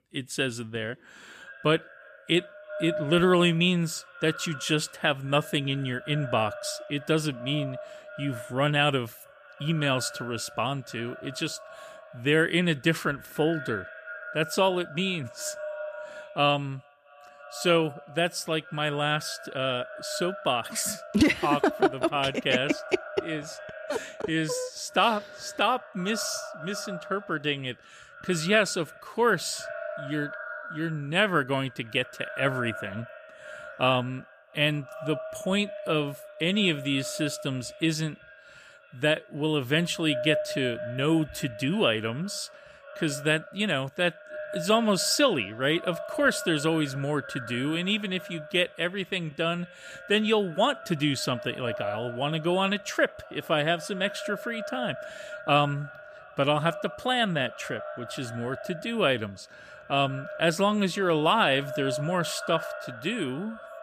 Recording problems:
echo of what is said; noticeable; throughout; 320 ms later, 15 dB below the speech

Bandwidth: 14.5 kHz